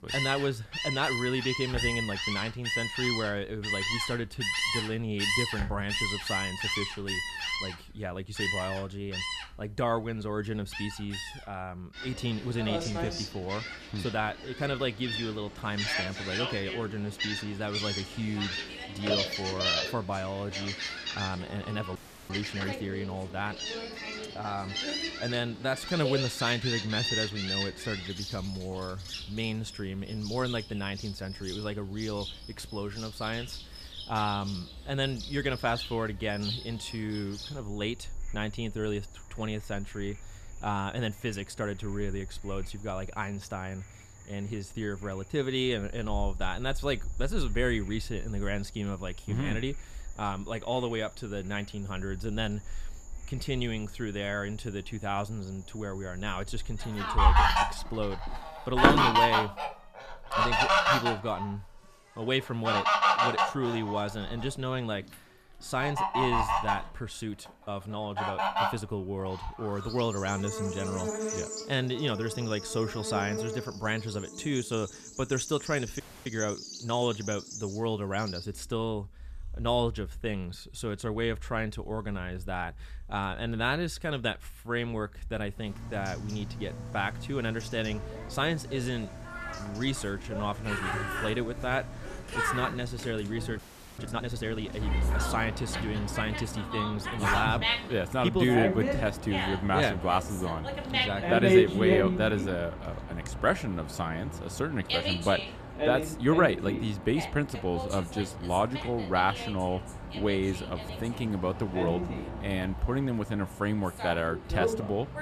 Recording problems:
animal sounds; very loud; throughout; as loud as the speech
audio freezing; at 22 s, at 1:16 and at 1:34

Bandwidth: 14.5 kHz